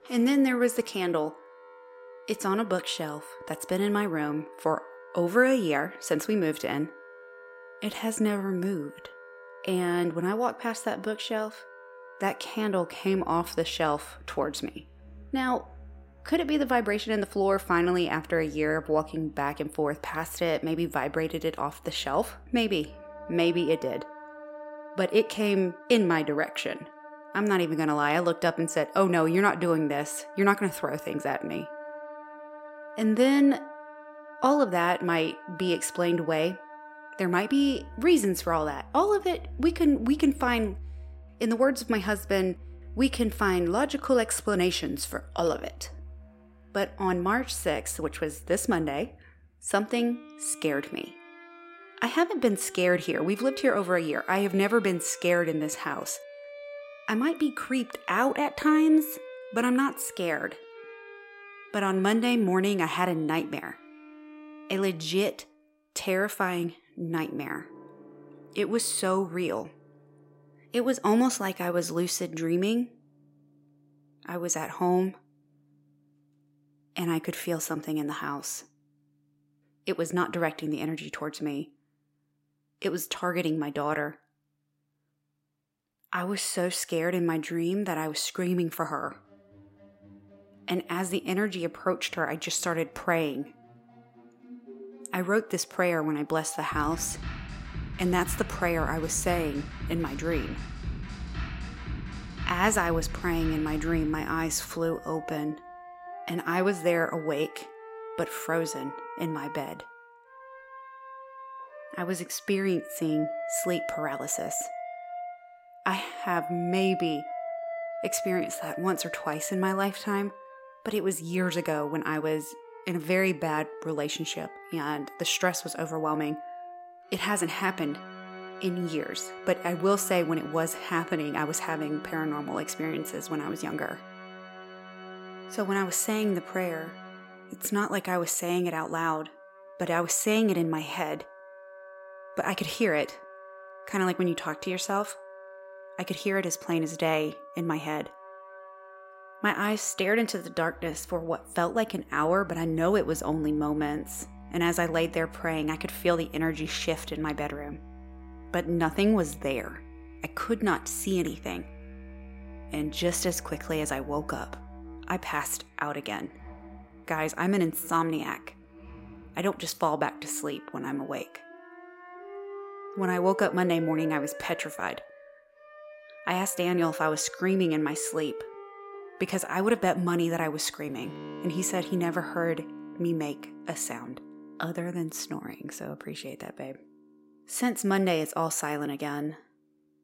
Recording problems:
background music; noticeable; throughout; 15 dB below the speech

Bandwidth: 16 kHz